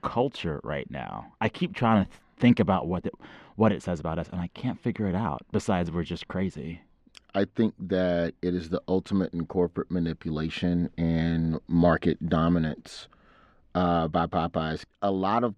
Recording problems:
muffled; slightly; fading above 3 kHz

